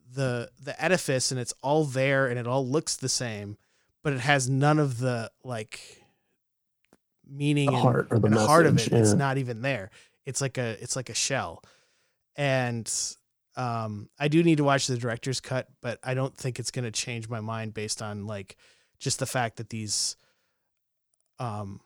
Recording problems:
none

